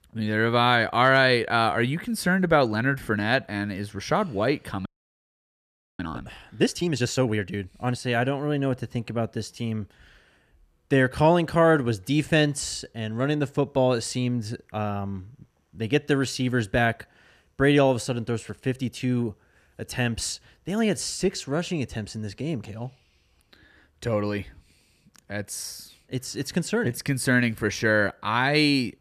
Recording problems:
audio freezing; at 5 s for 1 s

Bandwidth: 14.5 kHz